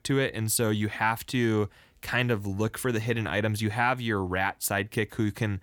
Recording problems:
none

